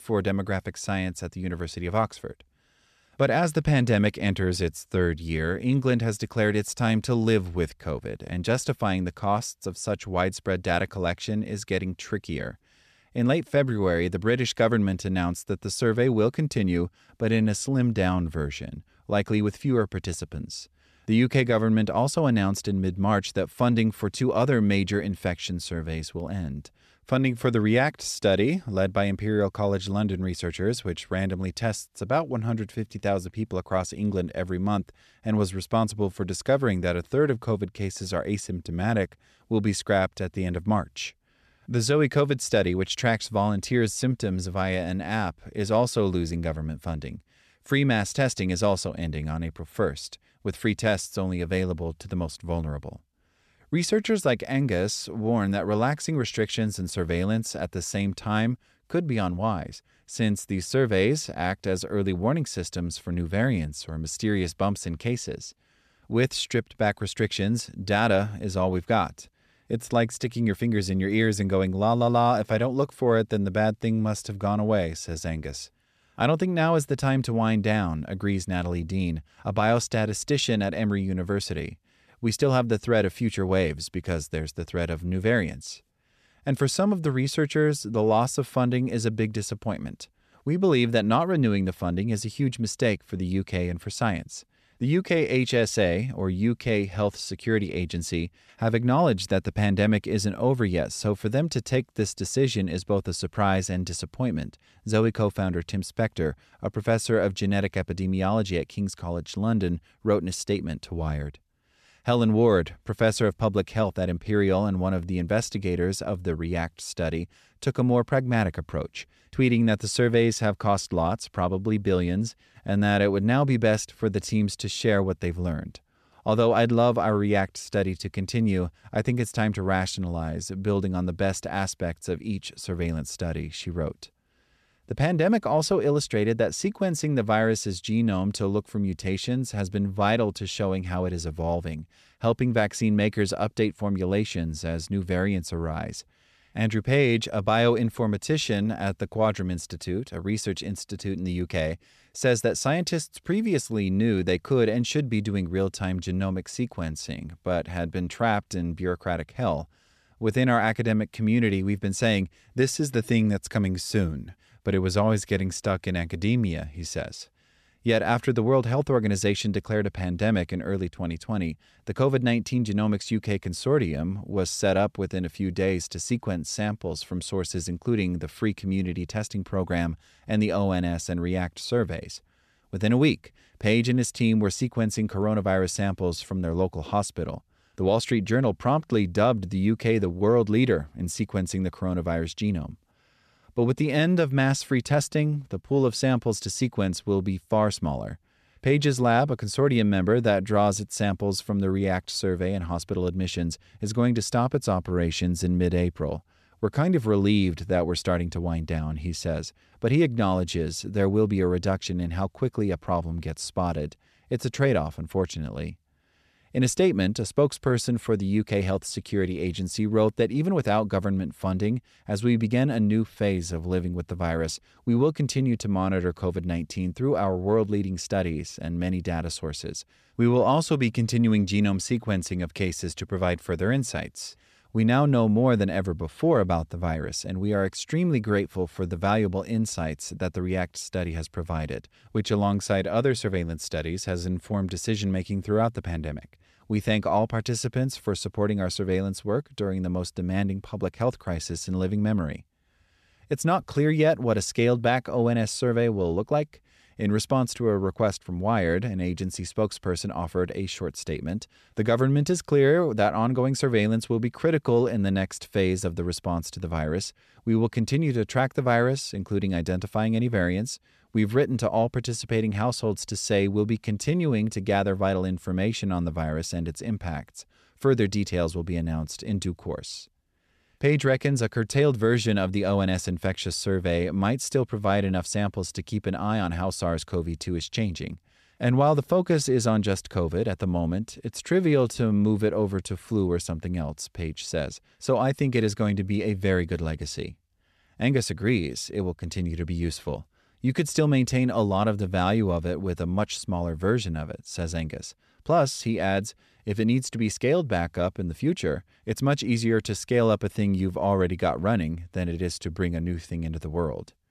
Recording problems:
none

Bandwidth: 14 kHz